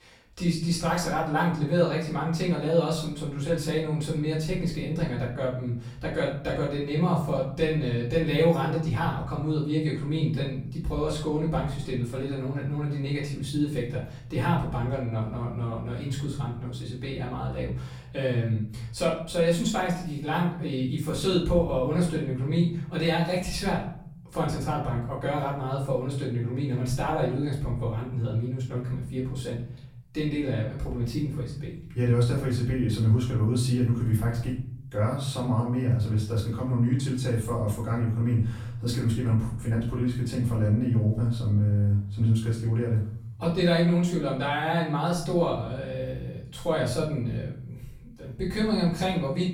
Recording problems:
off-mic speech; far
room echo; noticeable; dies away in 0.7 s

